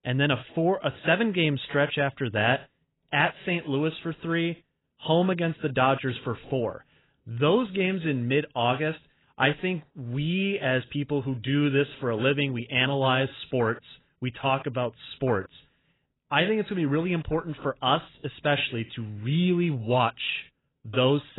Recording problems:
garbled, watery; badly; nothing above 3.5 kHz
abrupt cut into speech; at the end

